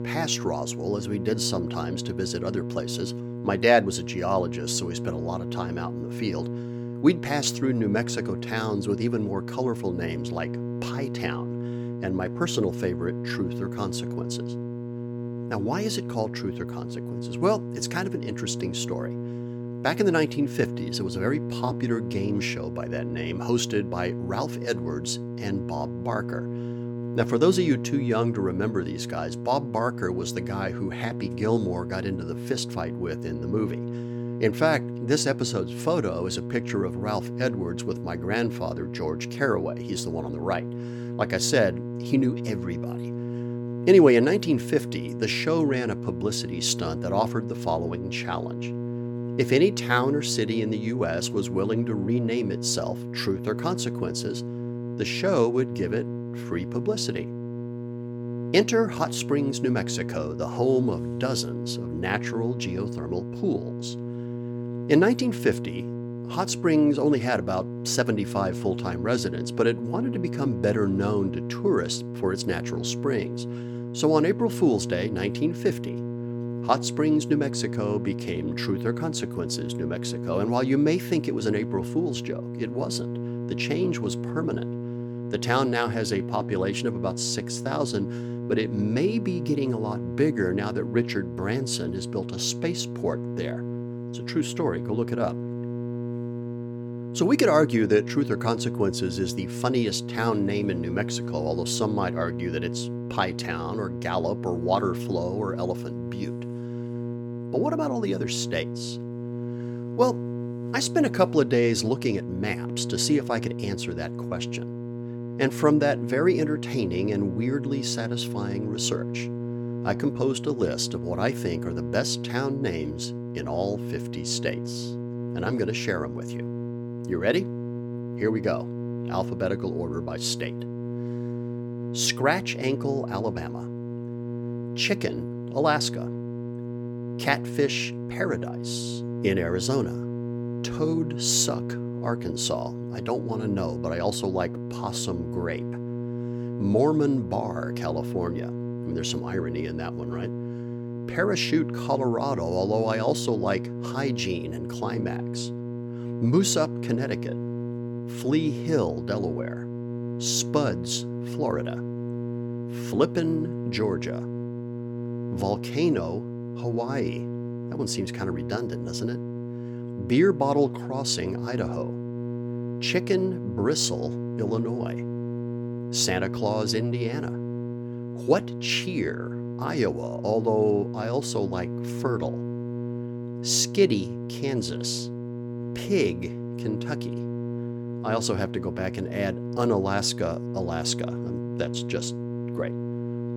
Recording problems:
electrical hum; loud; throughout; 60 Hz, 10 dB below the speech

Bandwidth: 18 kHz